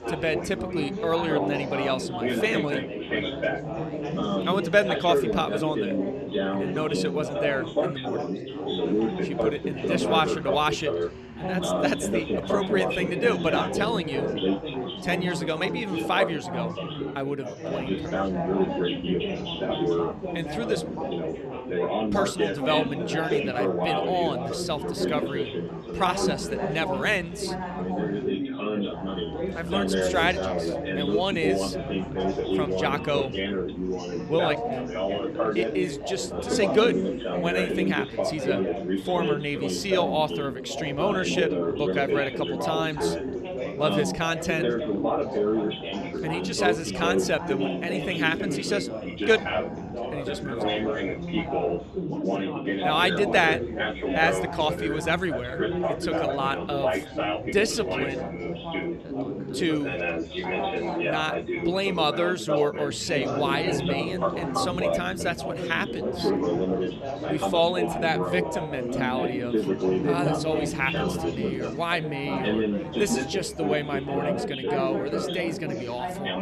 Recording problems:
chatter from many people; loud; throughout; as loud as the speech

